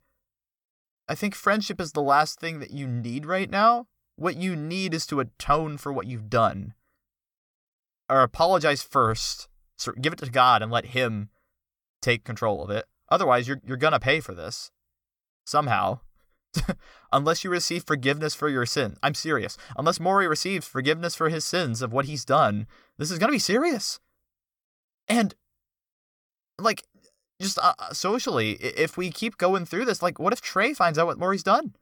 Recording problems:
none

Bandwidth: 18 kHz